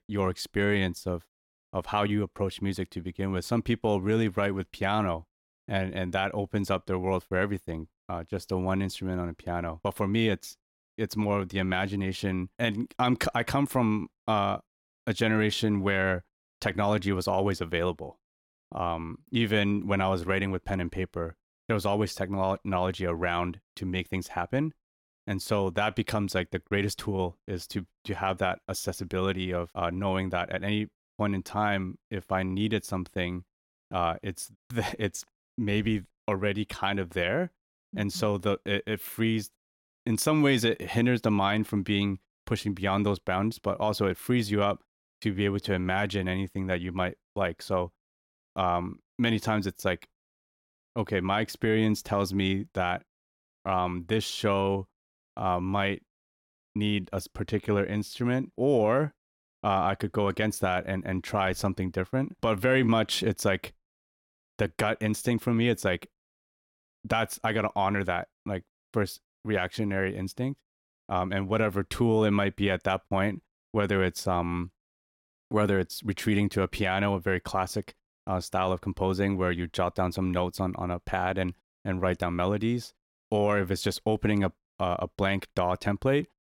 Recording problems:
none

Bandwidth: 16.5 kHz